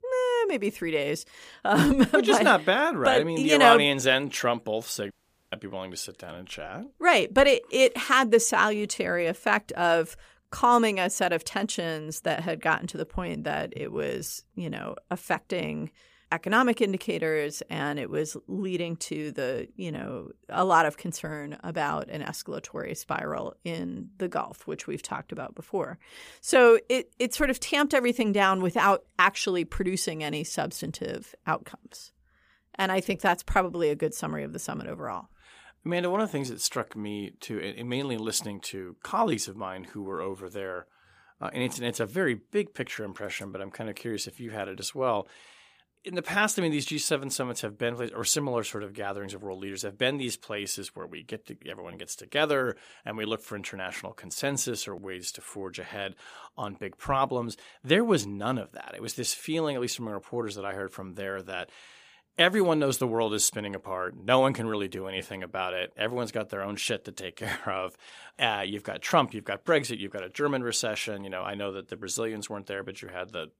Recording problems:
audio cutting out; at 5 s

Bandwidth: 15 kHz